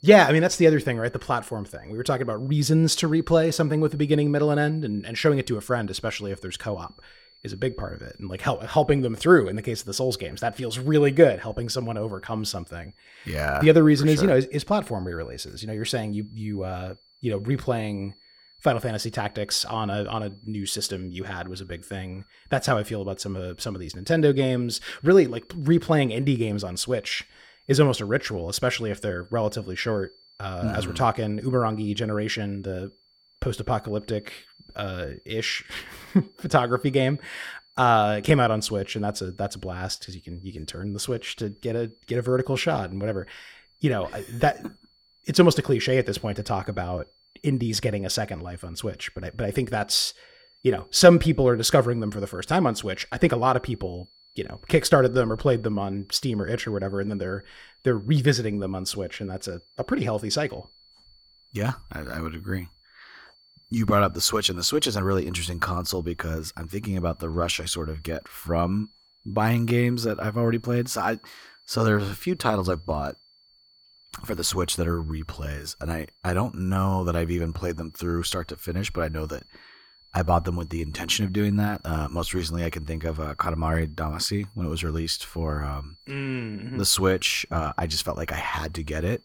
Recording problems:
high-pitched whine; faint; throughout; 4.5 kHz, 30 dB below the speech

